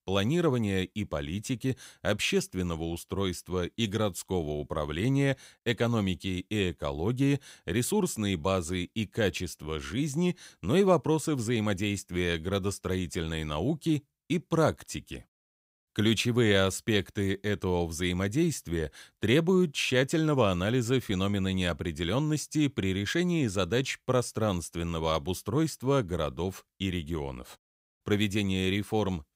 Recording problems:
none

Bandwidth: 15.5 kHz